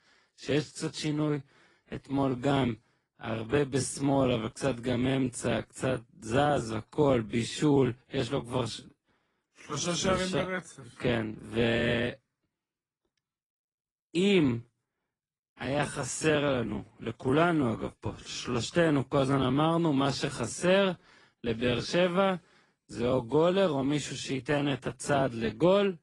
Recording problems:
wrong speed, natural pitch; too slow; 0.7 times normal speed
garbled, watery; slightly

